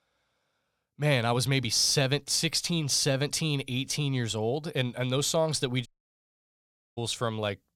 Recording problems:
audio cutting out; at 6 s for 1 s

